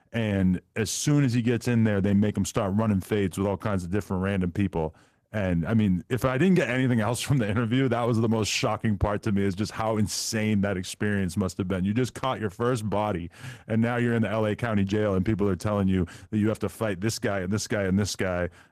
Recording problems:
garbled, watery; slightly; nothing above 14.5 kHz

